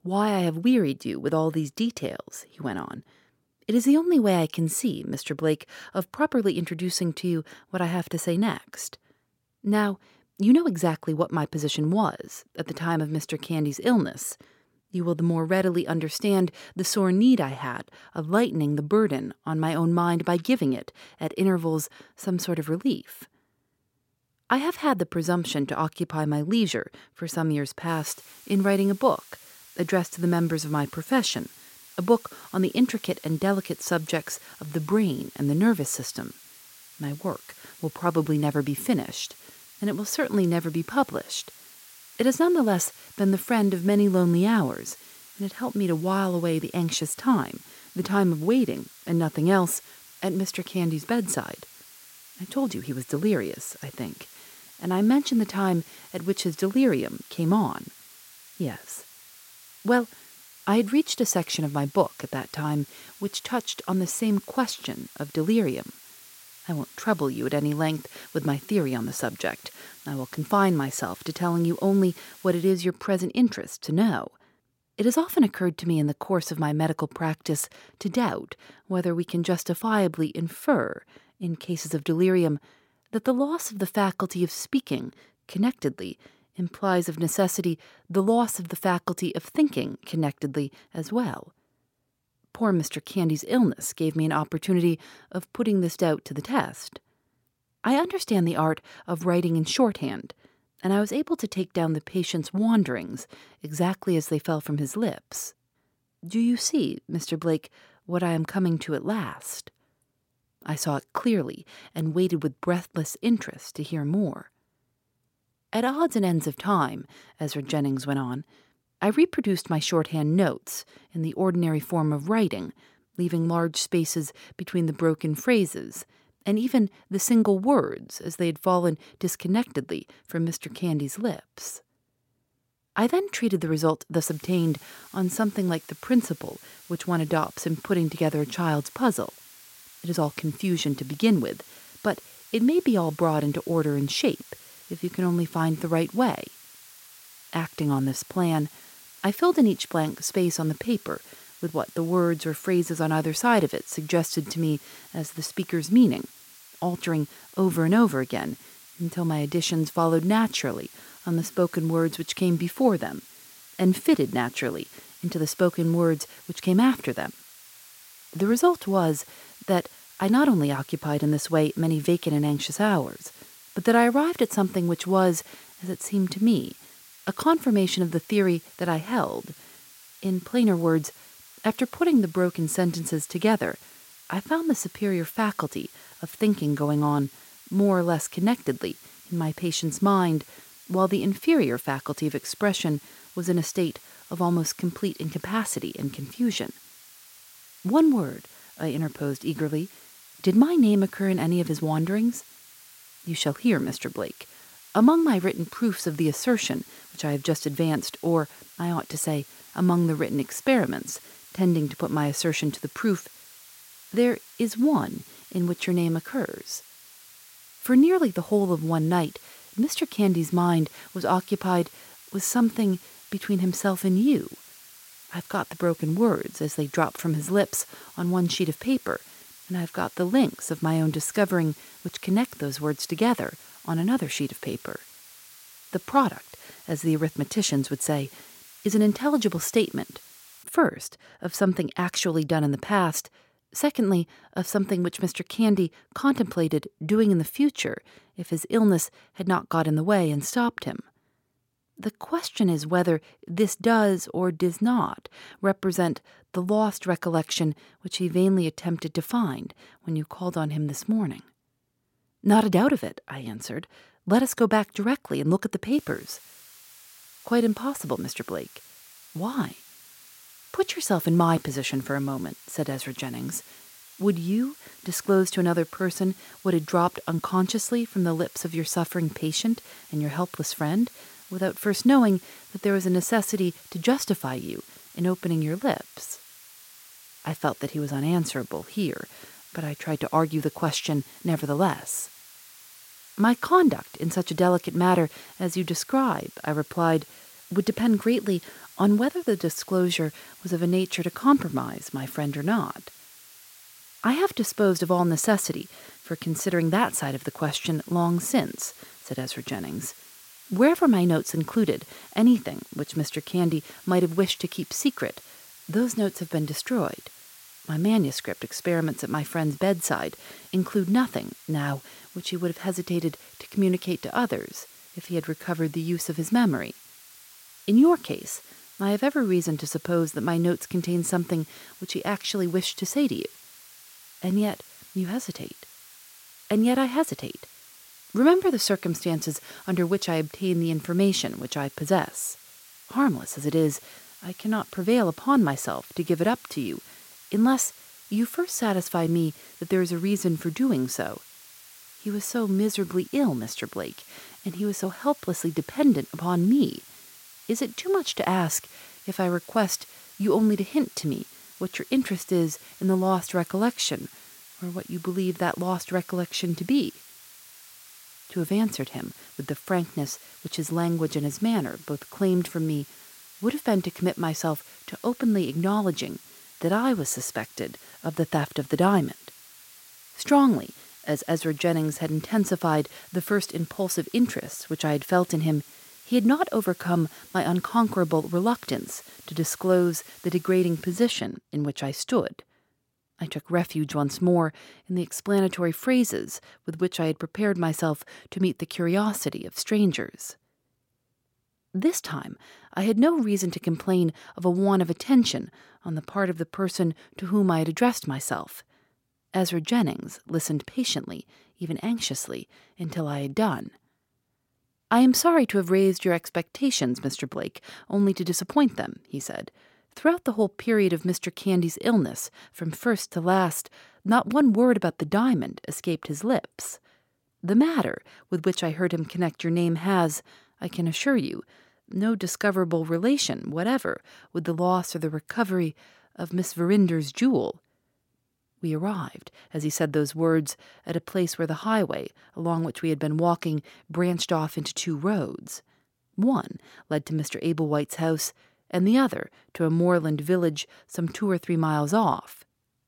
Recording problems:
hiss; faint; from 28 s to 1:13, from 2:14 to 4:01 and from 4:26 to 6:31; 20 dB below the speech

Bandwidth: 16.5 kHz